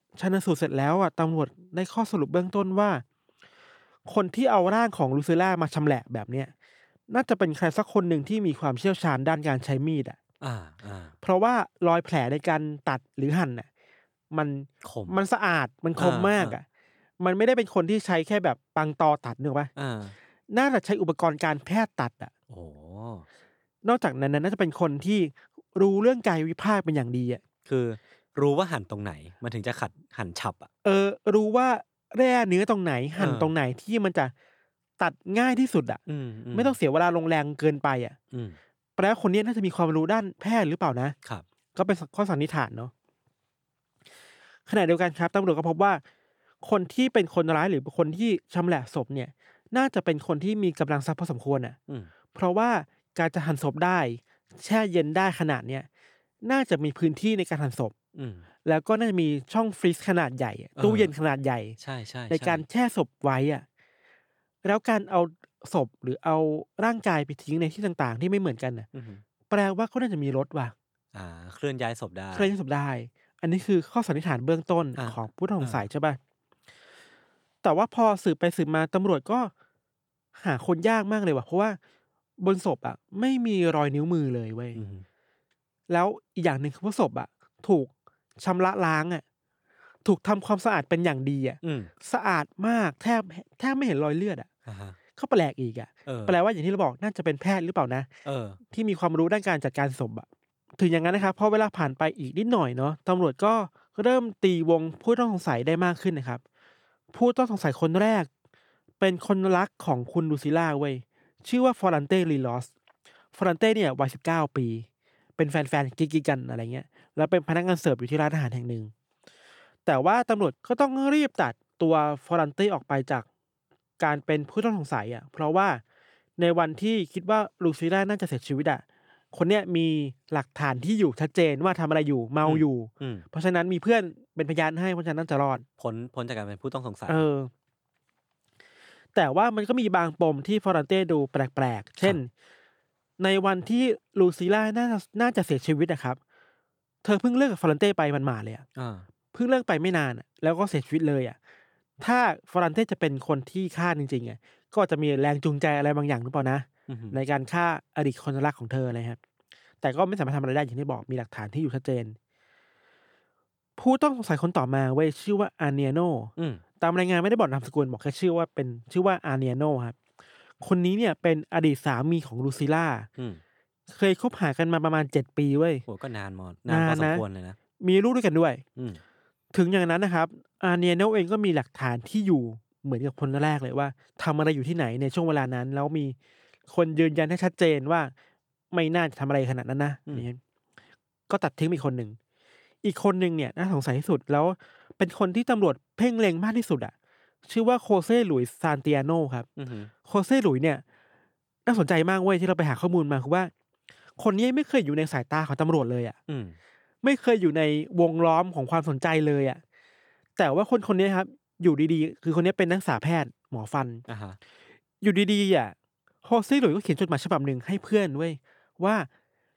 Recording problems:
none

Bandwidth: 18.5 kHz